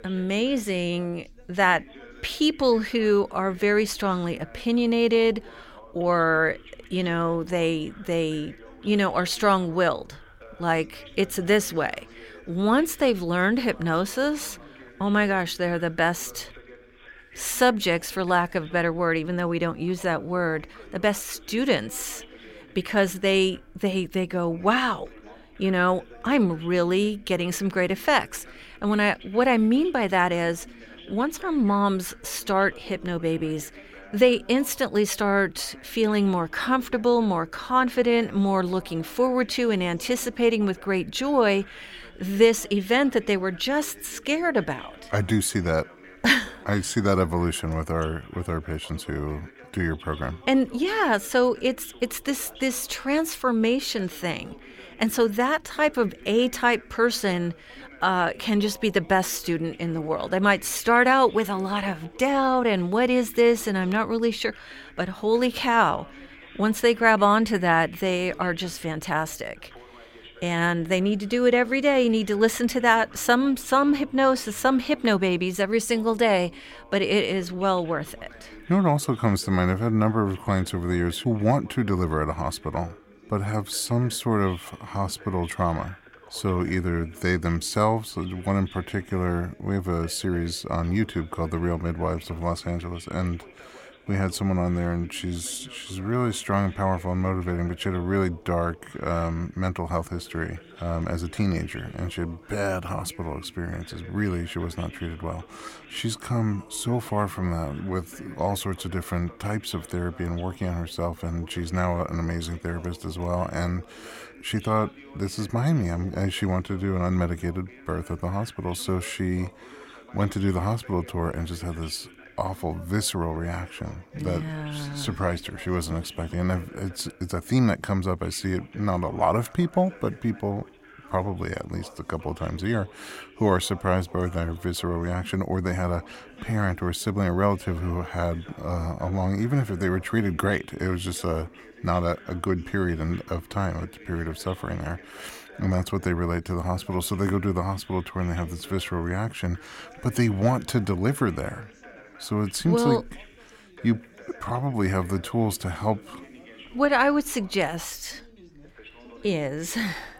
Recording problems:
background chatter; faint; throughout; 2 voices, 20 dB below the speech

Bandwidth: 16.5 kHz